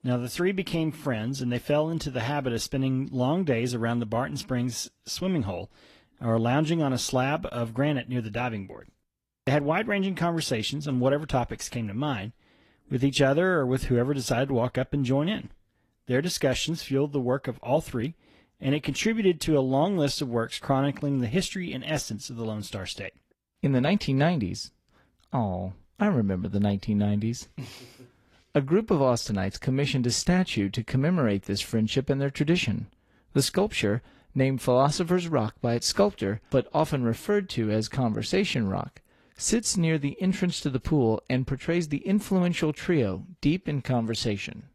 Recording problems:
garbled, watery; slightly; nothing above 12.5 kHz

